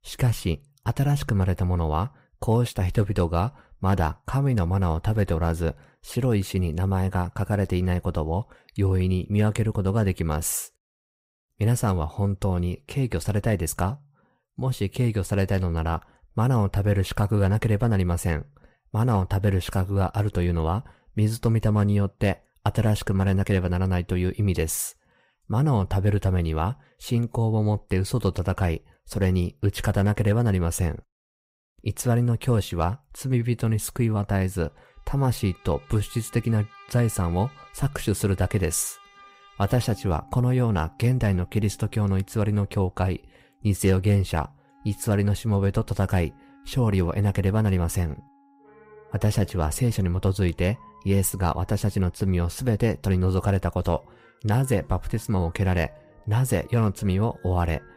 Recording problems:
background music; faint; from 35 s on; 25 dB below the speech

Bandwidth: 15.5 kHz